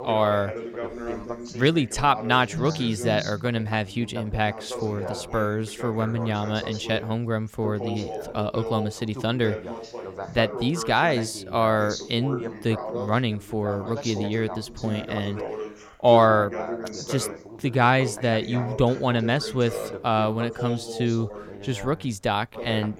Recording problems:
background chatter; loud; throughout; 2 voices, 10 dB below the speech

